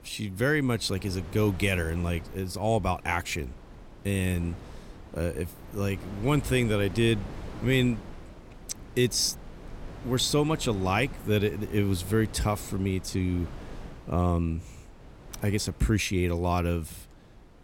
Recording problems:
wind noise on the microphone; occasional gusts; 20 dB below the speech

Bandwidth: 16.5 kHz